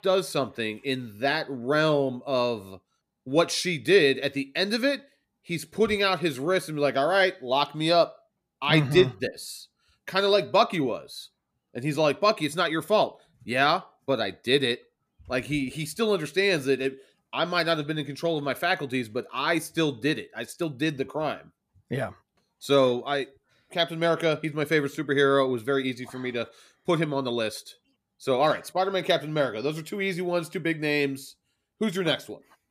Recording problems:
none

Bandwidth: 14.5 kHz